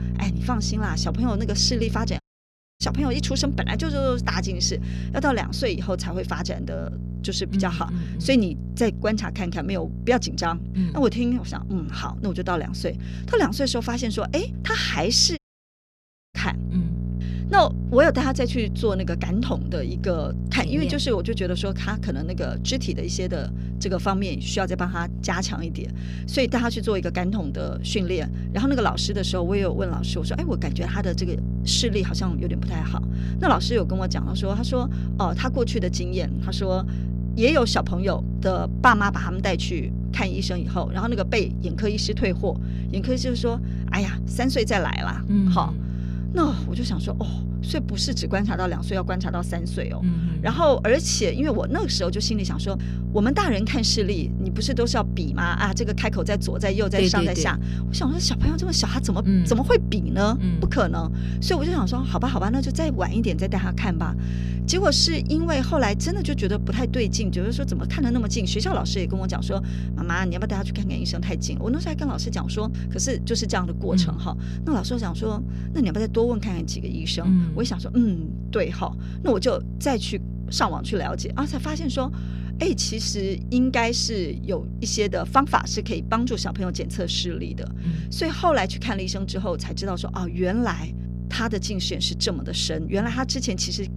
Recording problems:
electrical hum; noticeable; throughout; 60 Hz, 15 dB below the speech
audio cutting out; at 2 s for 0.5 s and at 15 s for 1 s

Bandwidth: 15 kHz